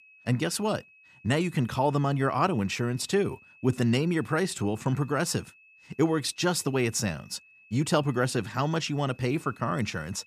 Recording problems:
high-pitched whine; faint; throughout; 2.5 kHz, 25 dB below the speech

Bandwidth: 14.5 kHz